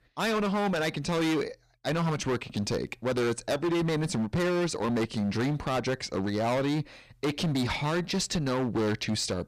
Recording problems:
distortion; heavy; 22% of the sound clipped

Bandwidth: 15 kHz